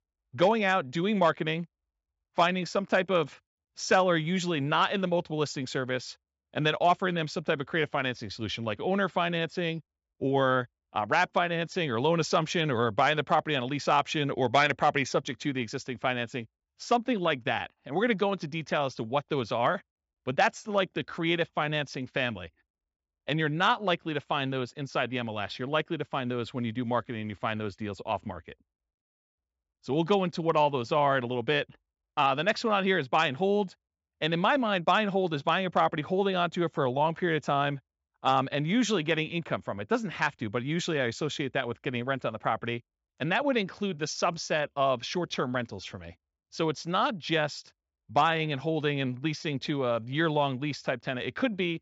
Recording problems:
high frequencies cut off; noticeable; nothing above 8 kHz

